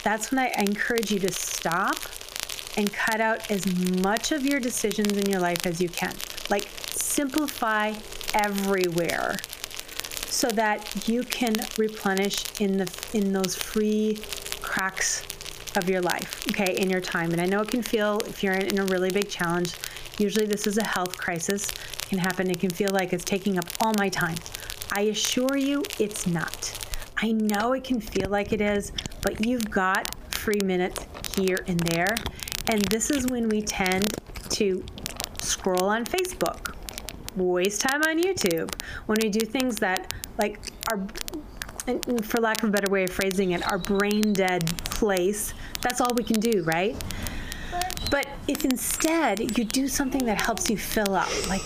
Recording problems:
squashed, flat; heavily, background pumping
crackle, like an old record; loud; 10 dB below the speech
animal sounds; noticeable; throughout; 10 dB below the speech

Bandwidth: 15 kHz